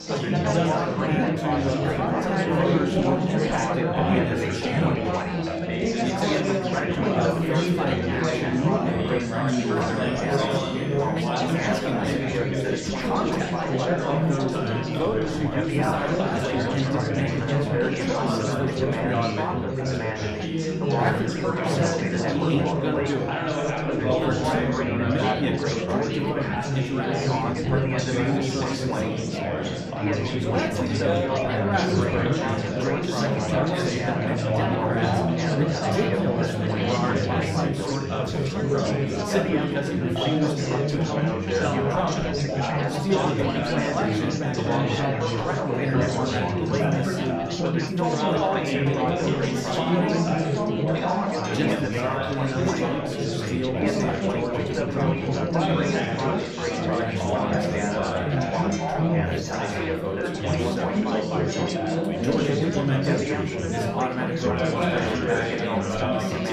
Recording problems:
room echo; slight; dies away in 0.6 s
off-mic speech; somewhat distant
chatter from many people; very loud; throughout; 5 dB above the speech
background music; noticeable; throughout; 15 dB below the speech

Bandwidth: 15 kHz